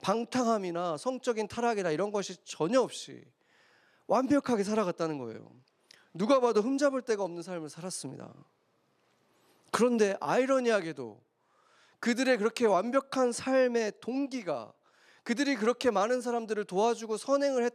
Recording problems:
none

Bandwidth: 14 kHz